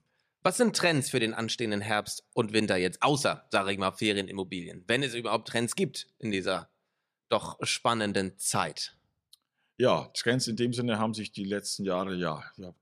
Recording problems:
none

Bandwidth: 14.5 kHz